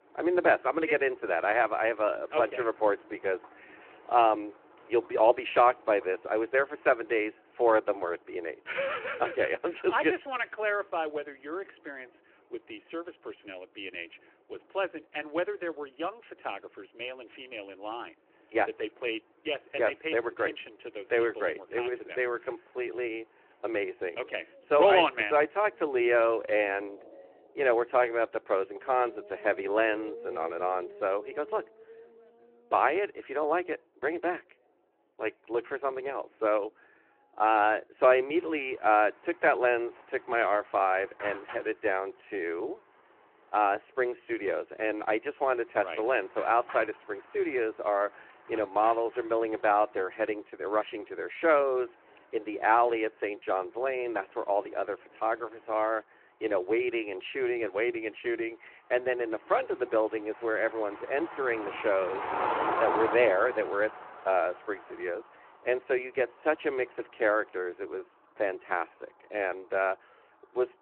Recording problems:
phone-call audio
traffic noise; noticeable; throughout; 10 dB below the speech

